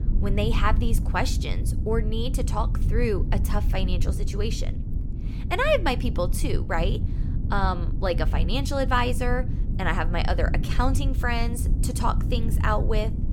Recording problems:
low rumble; noticeable; throughout; 15 dB below the speech

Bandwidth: 17 kHz